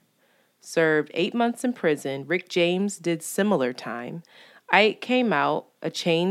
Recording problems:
abrupt cut into speech; at the end

